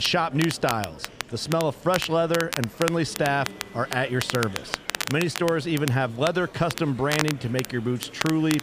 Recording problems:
crackle, like an old record; loud; 7 dB below the speech
murmuring crowd; noticeable; throughout; 20 dB below the speech
abrupt cut into speech; at the start

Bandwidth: 15 kHz